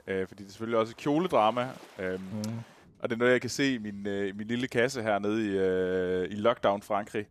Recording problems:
rain or running water; faint; throughout; 30 dB below the speech

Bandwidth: 14.5 kHz